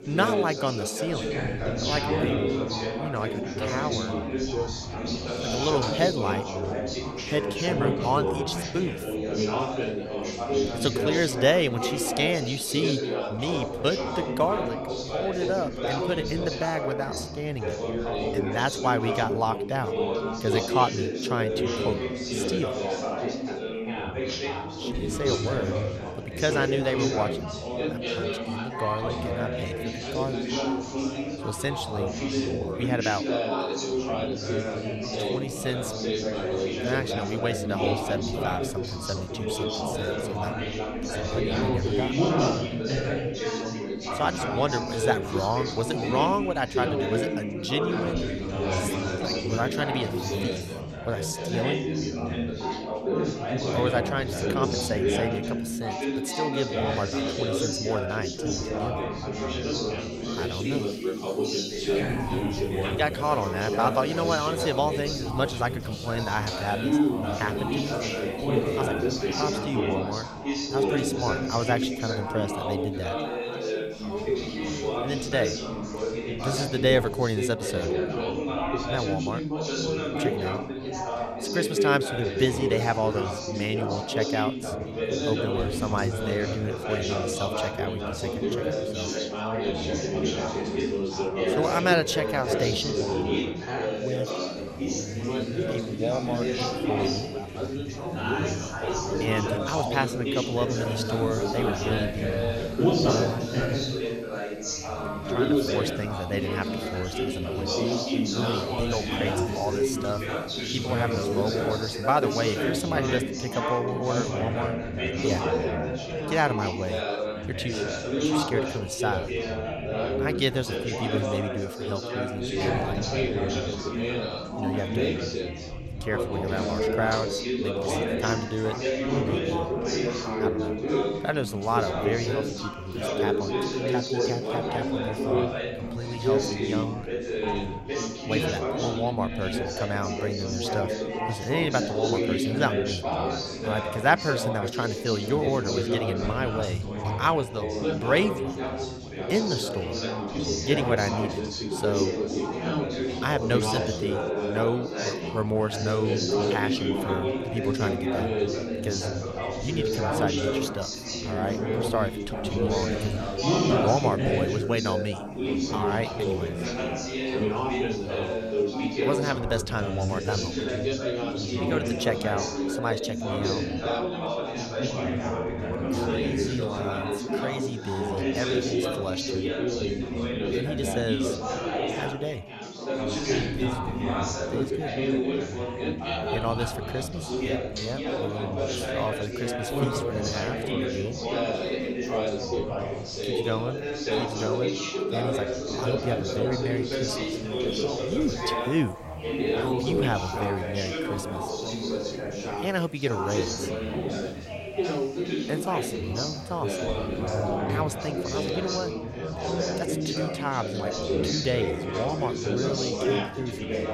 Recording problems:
chatter from many people; very loud; throughout; 2 dB above the speech
household noises; faint; throughout; 25 dB below the speech

